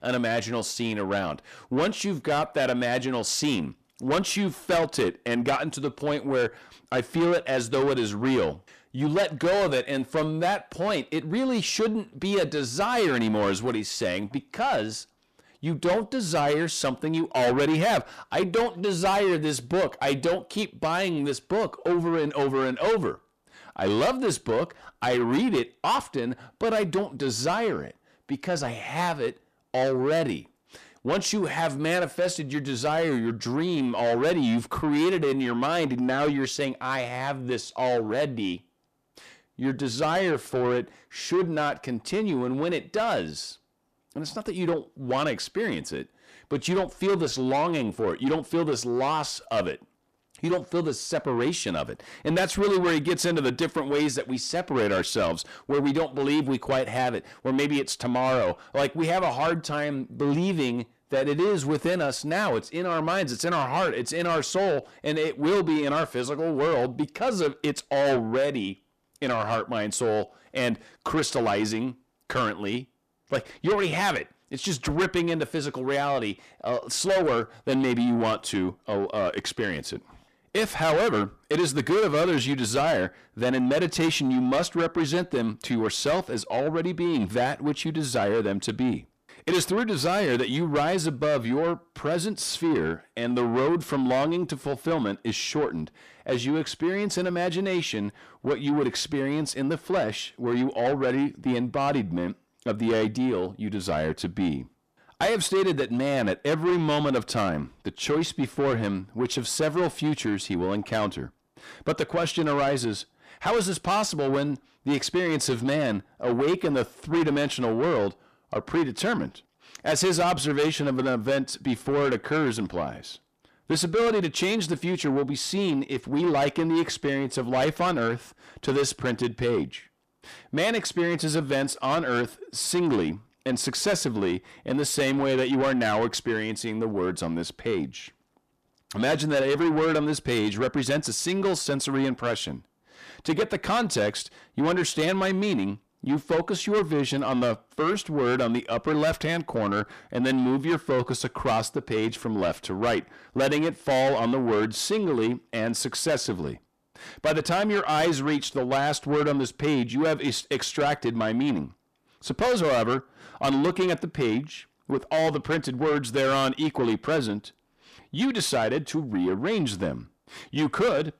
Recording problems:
distortion; heavy; 7 dB below the speech

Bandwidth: 14.5 kHz